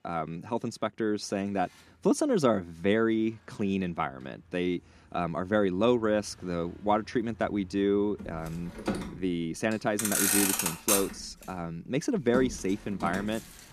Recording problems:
traffic noise; loud; throughout; as loud as the speech

